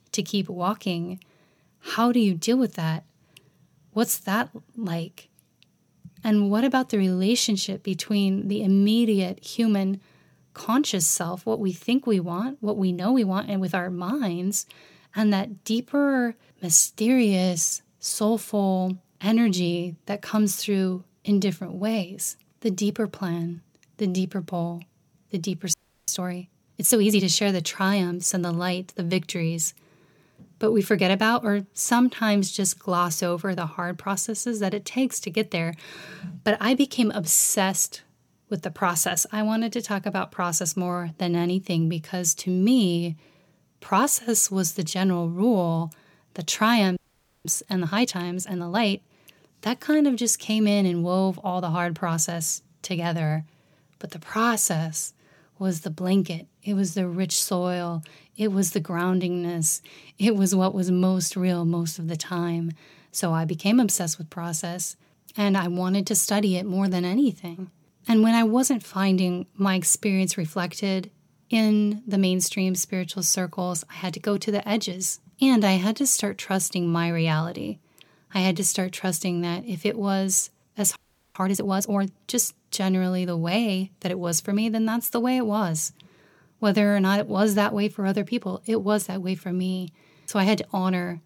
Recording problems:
audio freezing; at 26 s, at 47 s and at 1:21

